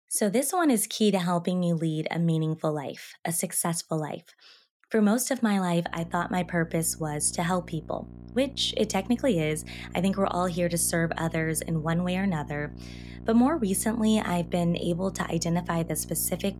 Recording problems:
electrical hum; faint; from 6 s on; 60 Hz, 20 dB below the speech

